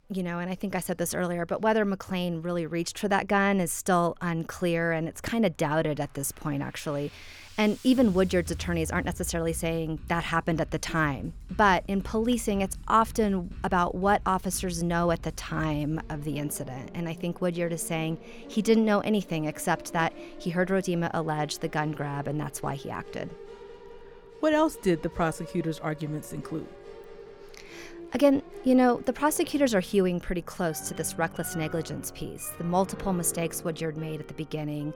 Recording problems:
background music; noticeable; throughout; 15 dB below the speech

